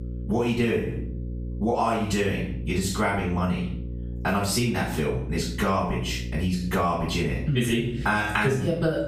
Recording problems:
off-mic speech; far
room echo; noticeable; dies away in 0.4 s
squashed, flat; somewhat
electrical hum; faint; throughout; 60 Hz, 20 dB below the speech

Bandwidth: 15 kHz